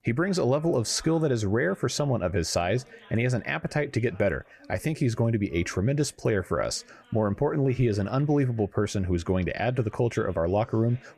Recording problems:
background chatter; faint; throughout; 2 voices, 30 dB below the speech

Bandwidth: 14 kHz